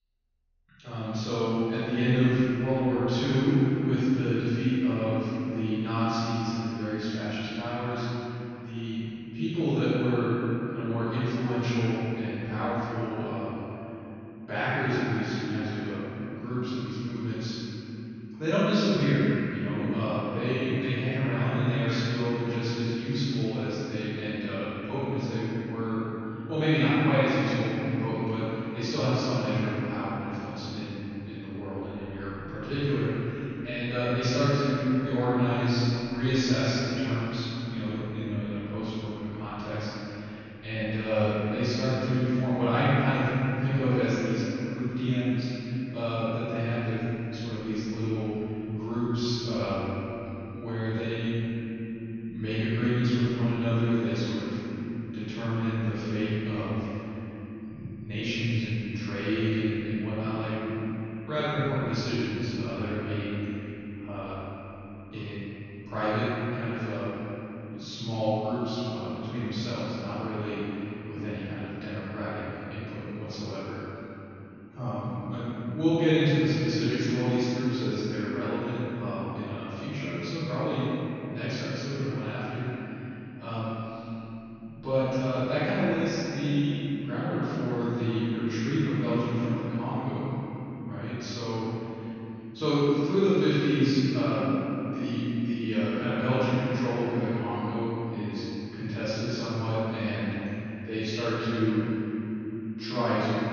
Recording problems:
room echo; strong; dies away in 3 s
off-mic speech; far
high frequencies cut off; noticeable; nothing above 6.5 kHz

